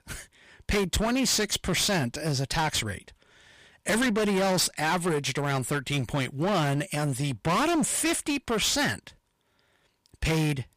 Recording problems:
distortion; heavy; 19% of the sound clipped

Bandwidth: 15 kHz